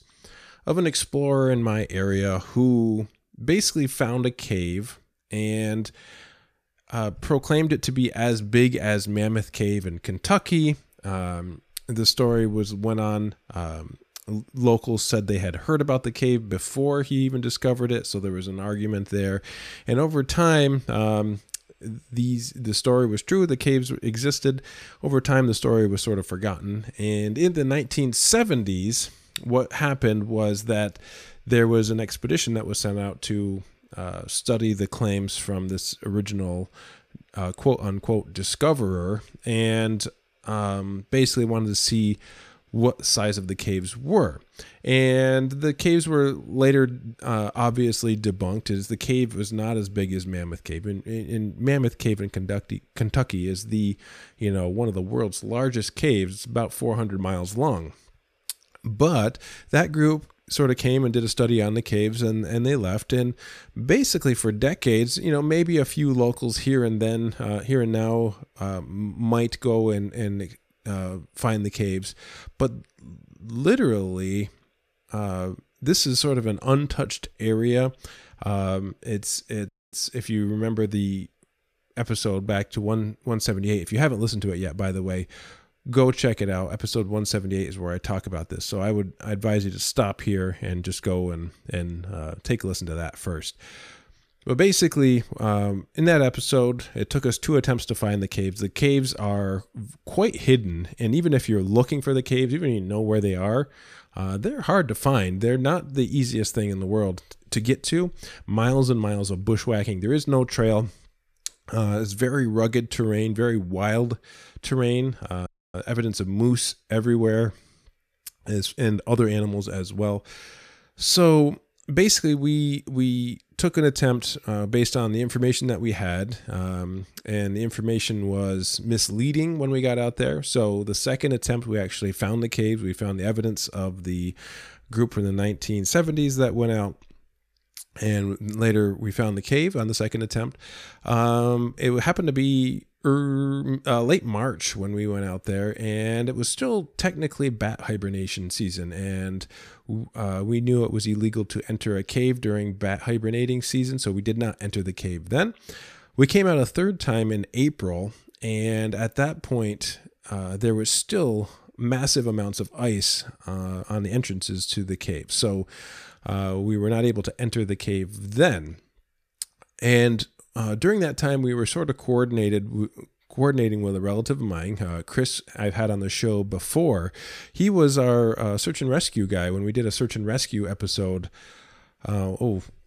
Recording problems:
audio cutting out; at 1:20 and at 1:55

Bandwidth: 14.5 kHz